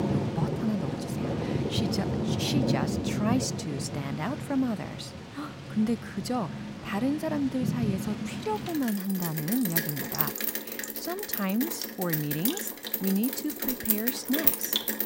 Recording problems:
rain or running water; very loud; throughout; 2 dB above the speech

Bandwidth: 16 kHz